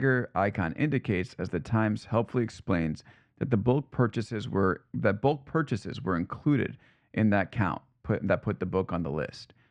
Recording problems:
muffled; very; fading above 2 kHz
abrupt cut into speech; at the start

